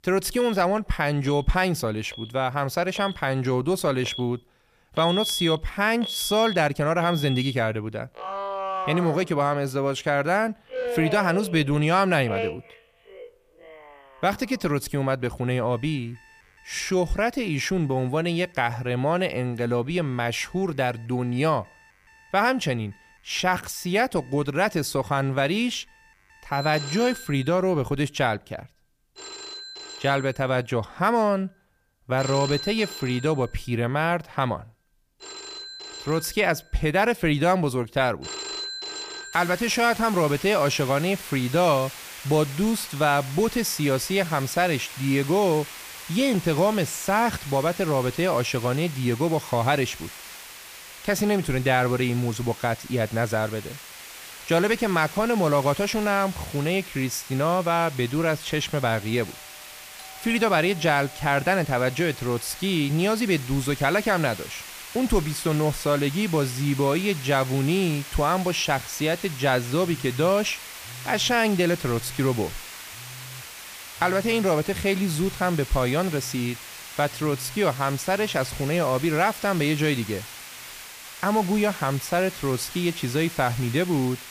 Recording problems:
alarms or sirens; noticeable; throughout; 10 dB below the speech
hiss; noticeable; from 39 s on; 15 dB below the speech

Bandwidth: 15 kHz